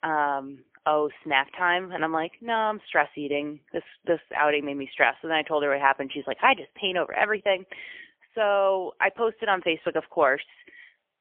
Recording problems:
phone-call audio; poor line; nothing above 3.5 kHz

